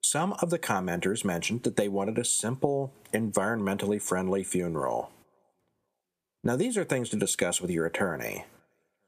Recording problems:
squashed, flat; somewhat

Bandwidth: 14.5 kHz